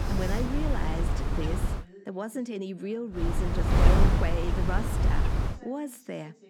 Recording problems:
wind noise on the microphone; heavy; until 2 s and from 3 to 5.5 s; 2 dB above the speech
voice in the background; noticeable; throughout; 20 dB below the speech

